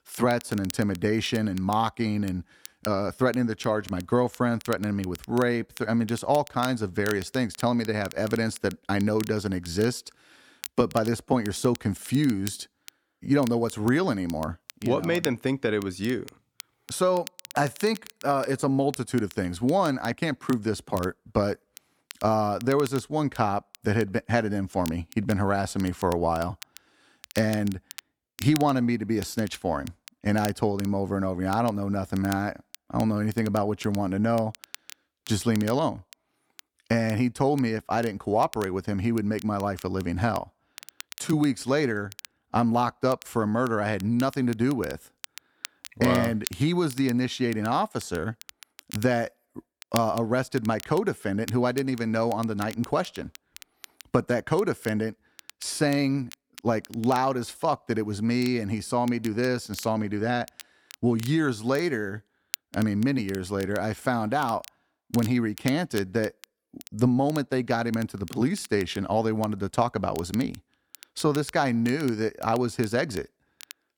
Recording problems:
crackle, like an old record; noticeable; 20 dB below the speech

